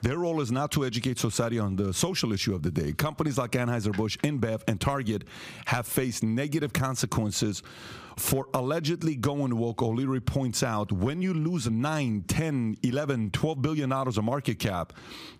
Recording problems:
squashed, flat; somewhat

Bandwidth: 15 kHz